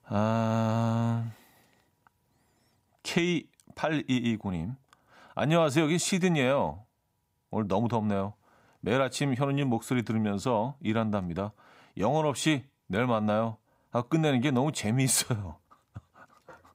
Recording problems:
none

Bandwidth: 15.5 kHz